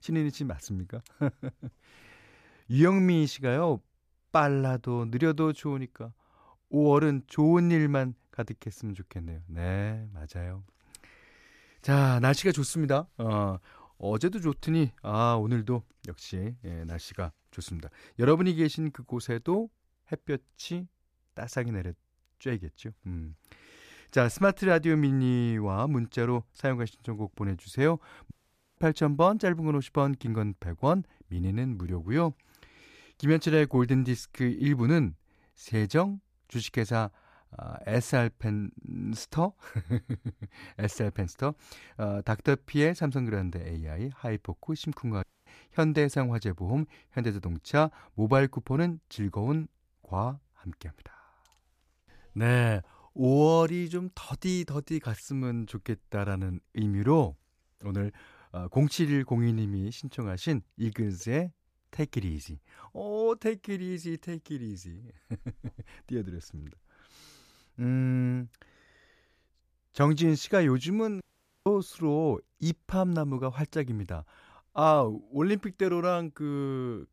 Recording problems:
audio cutting out; at 28 s, at 45 s and at 1:11

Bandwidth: 14.5 kHz